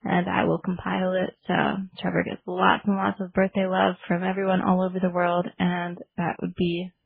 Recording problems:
garbled, watery; badly
muffled; very; fading above 3 kHz

